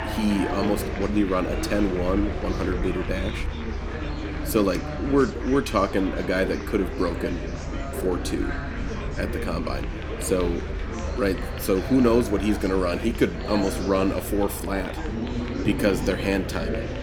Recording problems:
murmuring crowd; loud; throughout; 7 dB below the speech
low rumble; faint; throughout; 25 dB below the speech

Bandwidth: 18.5 kHz